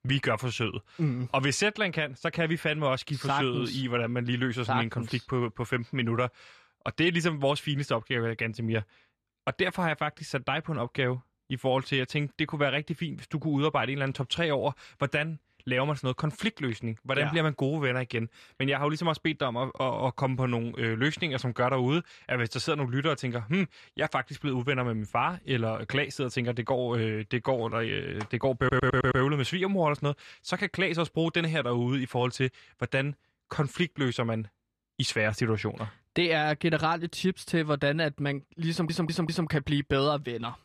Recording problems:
audio stuttering; at 29 s and at 39 s

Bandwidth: 14 kHz